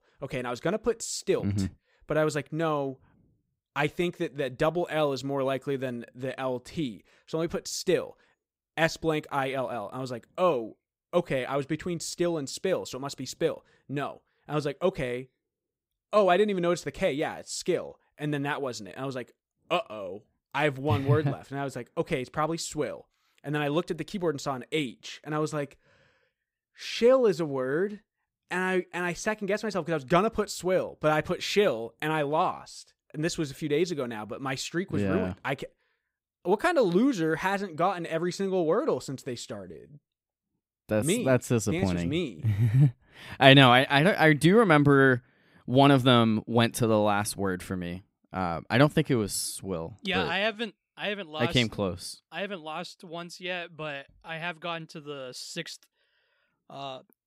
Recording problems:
none

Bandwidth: 15.5 kHz